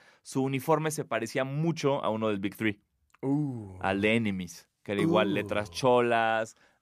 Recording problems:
none

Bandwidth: 15 kHz